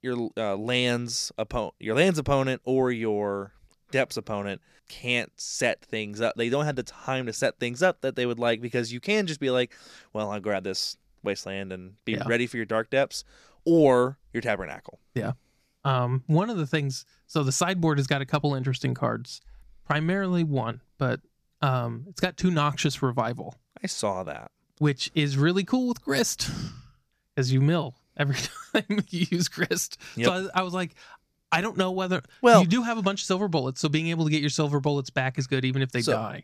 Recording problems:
none

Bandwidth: 14.5 kHz